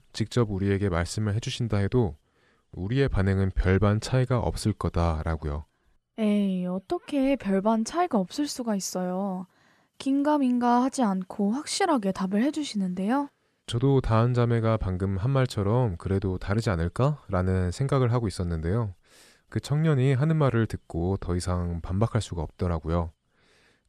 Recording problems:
none

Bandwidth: 13.5 kHz